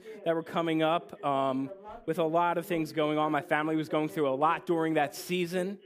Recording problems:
voice in the background; noticeable; throughout; 20 dB below the speech

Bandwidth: 15 kHz